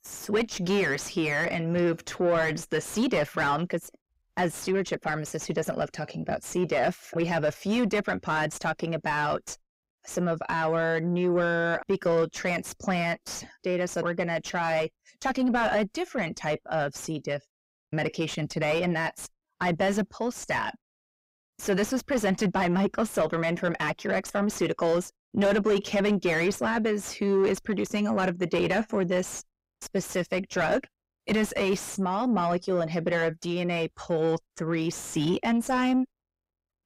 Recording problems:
distortion; heavy; 6 dB below the speech

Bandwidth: 15.5 kHz